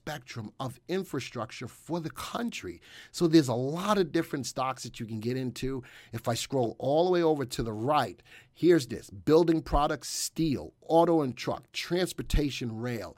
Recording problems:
none

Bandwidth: 16 kHz